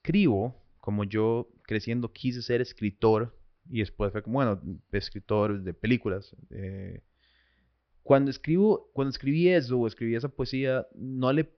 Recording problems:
high frequencies cut off; noticeable; nothing above 5.5 kHz

